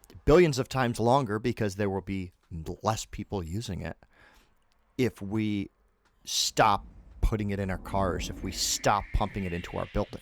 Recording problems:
rain or running water; noticeable; from 6.5 s on; 15 dB below the speech

